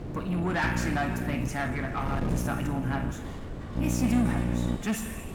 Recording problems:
distortion; heavy; 8 dB below the speech
room echo; slight; dies away in 1.4 s
off-mic speech; somewhat distant
electrical hum; loud; at 0.5 s, at 2.5 s and from 4 to 5 s; 60 Hz, 7 dB below the speech
rain or running water; noticeable; throughout; 10 dB below the speech
wind noise on the microphone; occasional gusts; 10 dB below the speech

